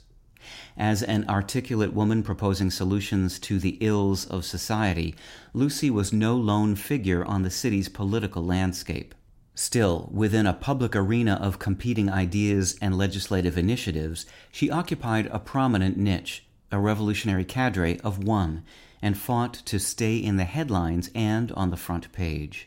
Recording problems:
none

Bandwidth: 16 kHz